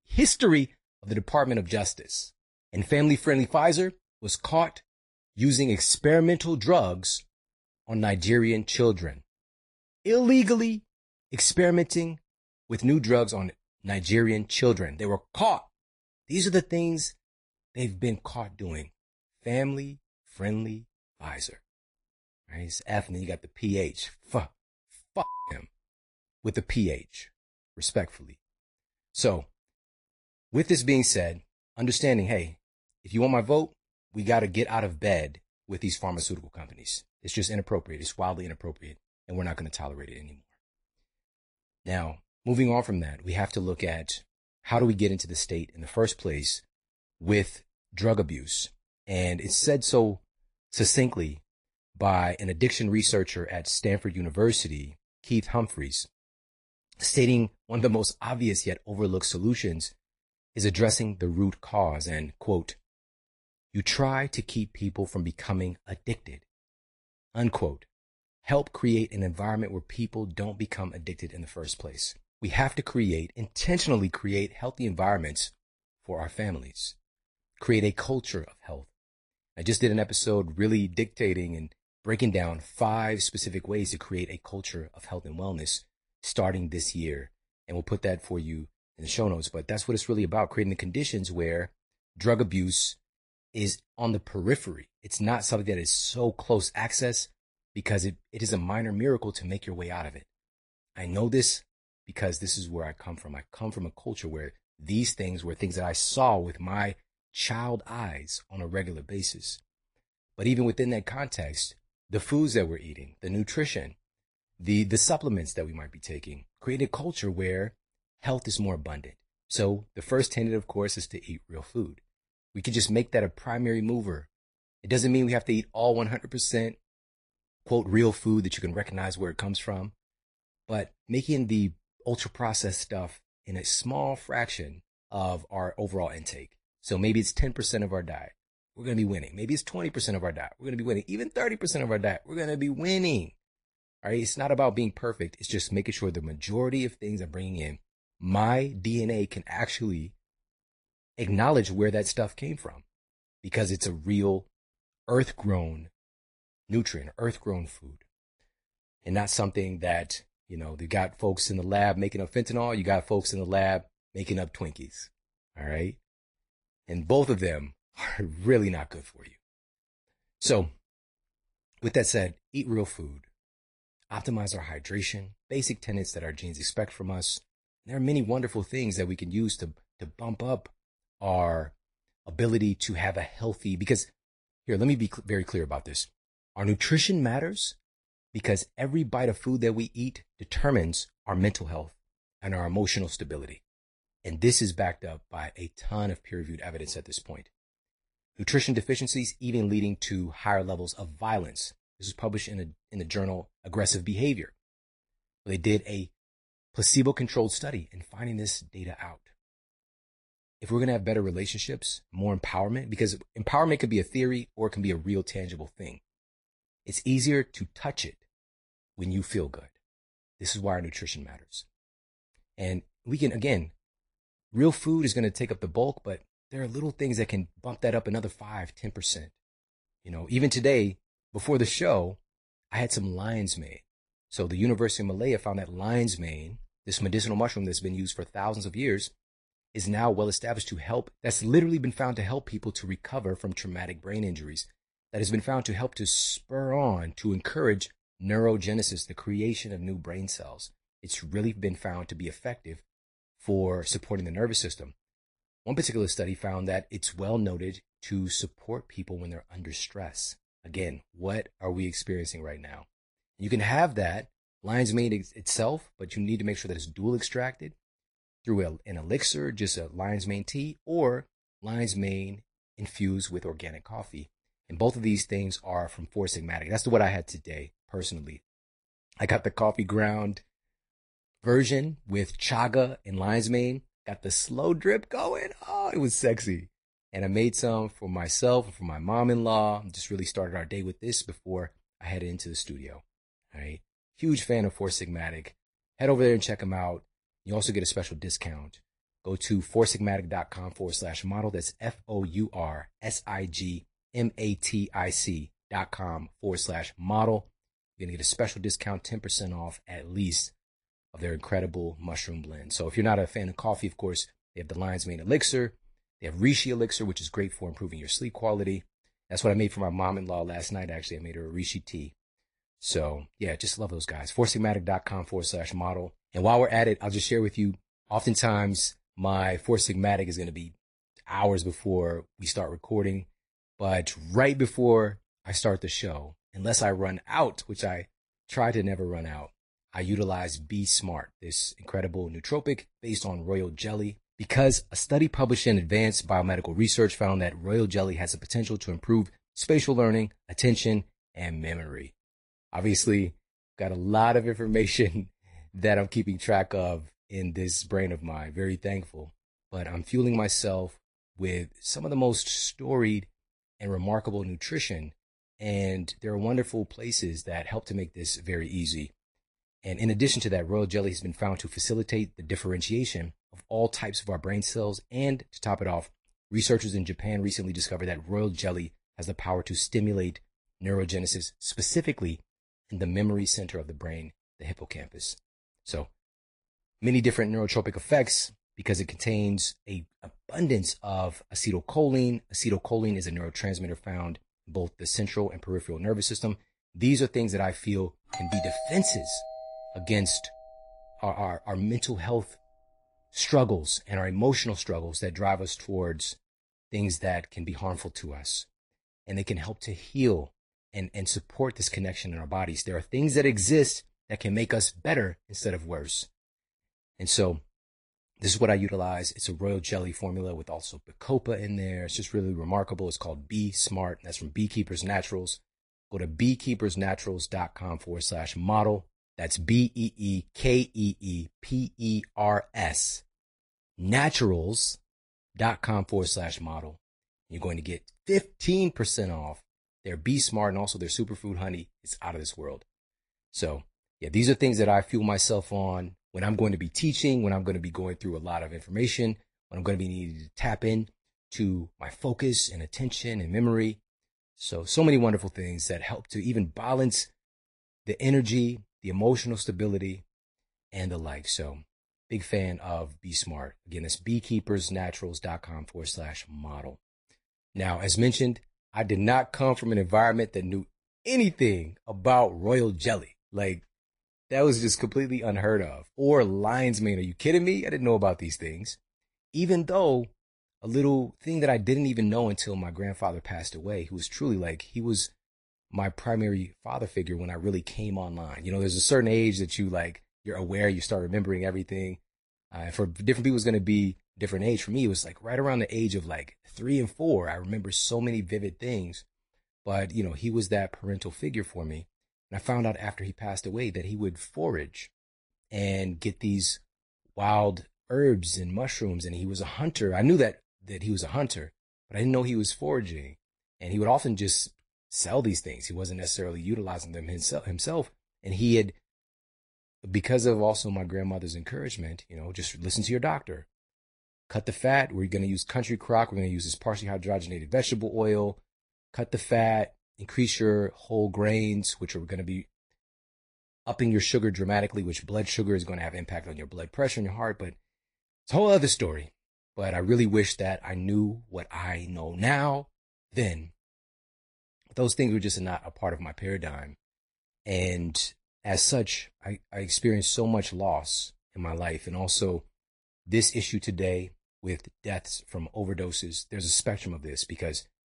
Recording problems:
garbled, watery; slightly; nothing above 10.5 kHz
doorbell; noticeable; from 6:38 to 6:41; peak 4 dB below the speech

